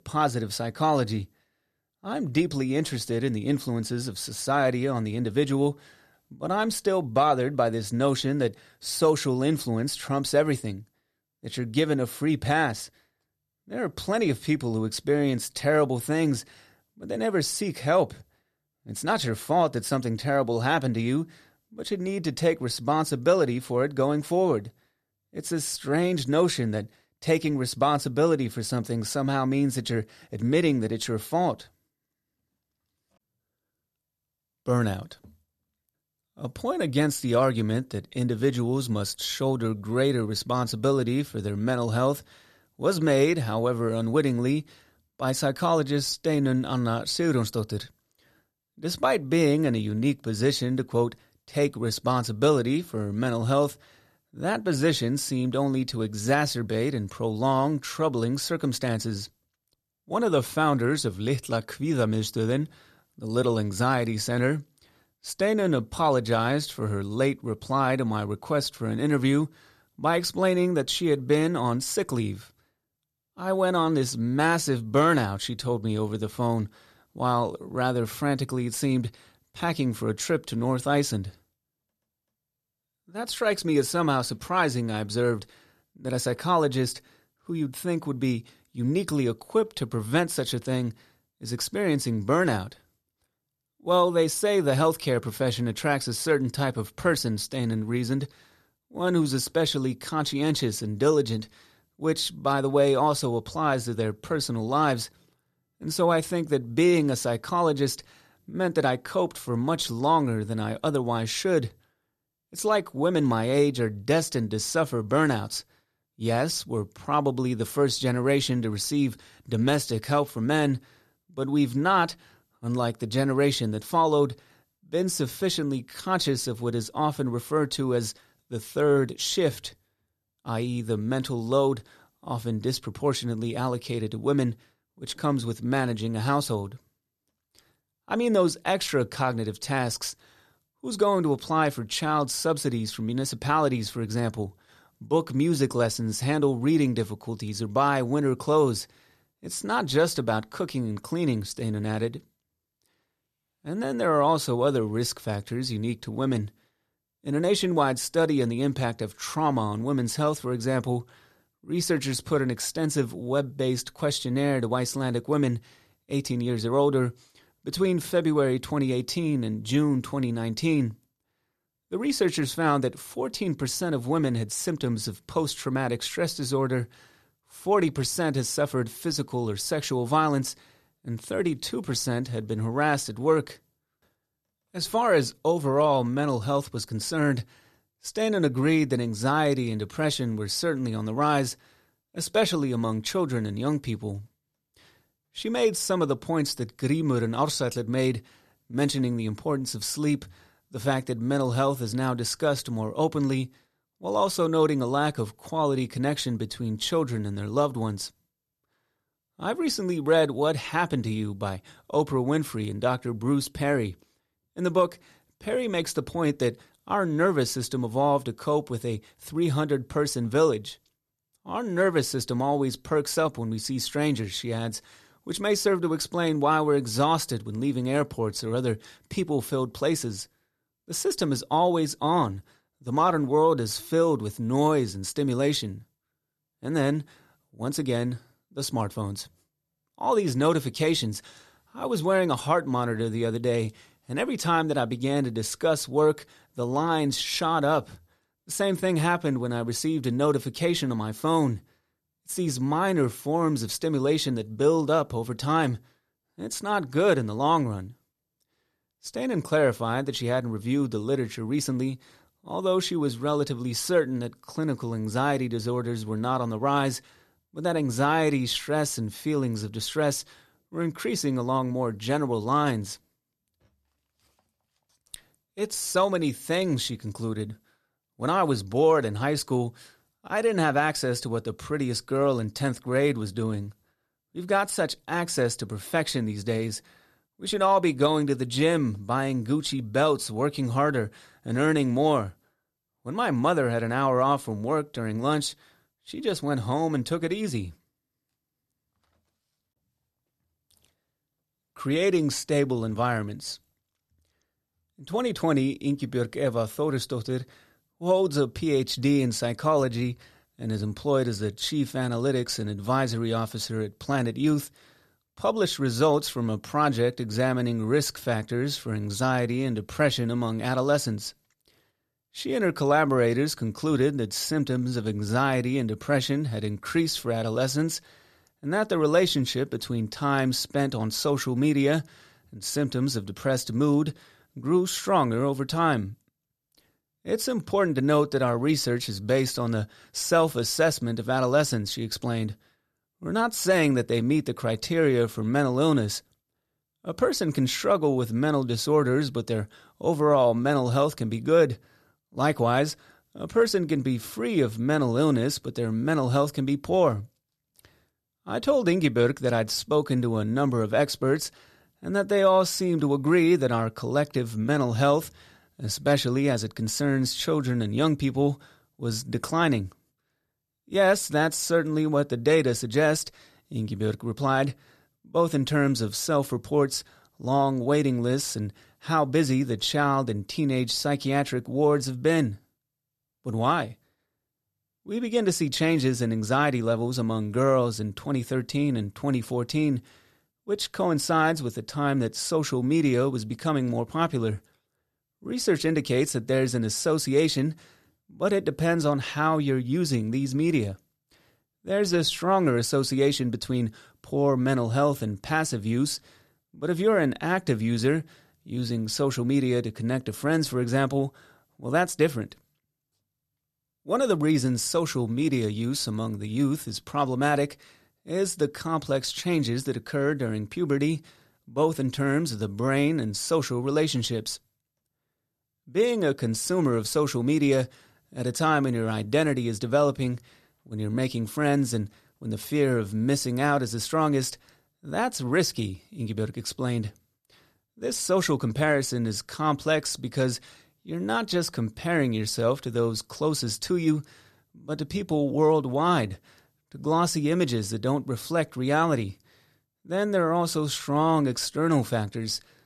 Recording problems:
none

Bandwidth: 14.5 kHz